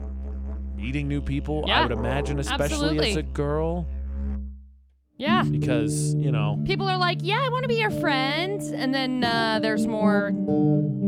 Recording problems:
background music; loud; throughout; 2 dB below the speech

